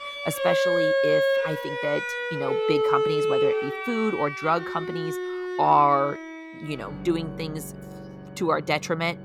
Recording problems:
background music; very loud; throughout; as loud as the speech

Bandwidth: 18.5 kHz